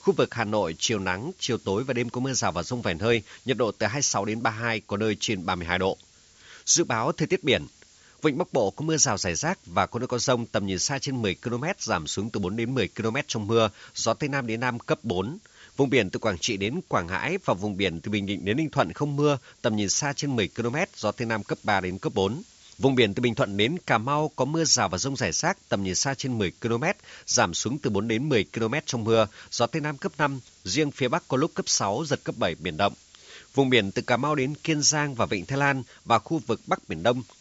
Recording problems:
high frequencies cut off; noticeable; nothing above 8 kHz
hiss; faint; throughout; 30 dB below the speech

